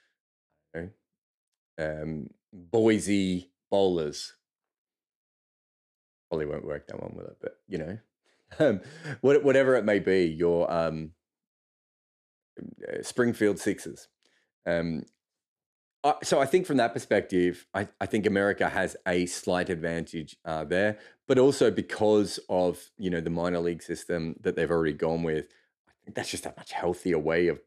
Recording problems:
none

